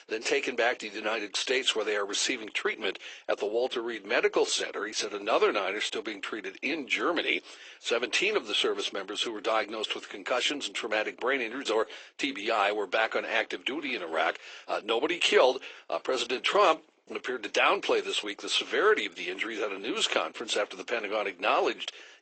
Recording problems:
thin; very; fading below 350 Hz
garbled, watery; slightly; nothing above 8 kHz
high frequencies cut off; slight

